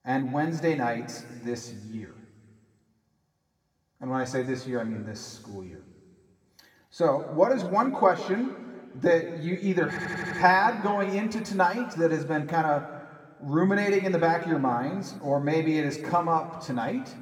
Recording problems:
room echo; slight; dies away in 1.5 s
off-mic speech; somewhat distant
audio stuttering; at 10 s

